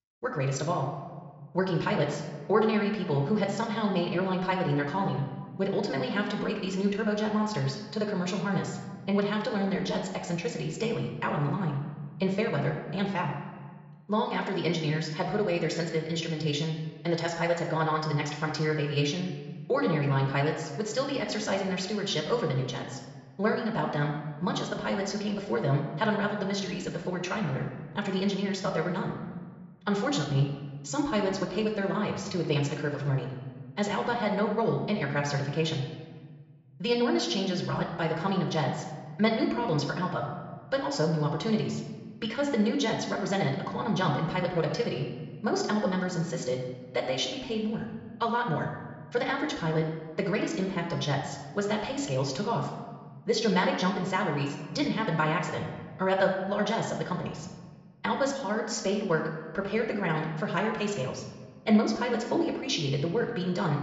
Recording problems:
wrong speed, natural pitch; too fast; 1.6 times normal speed
high frequencies cut off; noticeable; nothing above 8 kHz
room echo; slight; dies away in 1.2 s
off-mic speech; somewhat distant

